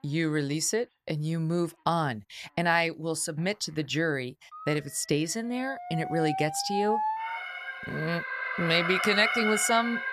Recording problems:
alarms or sirens; loud; throughout; 3 dB below the speech

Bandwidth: 14 kHz